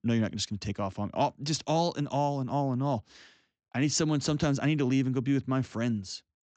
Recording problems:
high frequencies cut off; noticeable; nothing above 8 kHz

